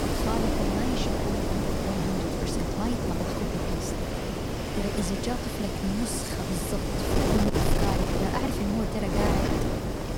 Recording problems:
wind noise on the microphone; heavy; 5 dB above the speech

